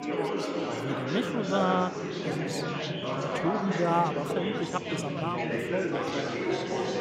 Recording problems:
chatter from many people; very loud; throughout; 1 dB above the speech

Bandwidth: 16 kHz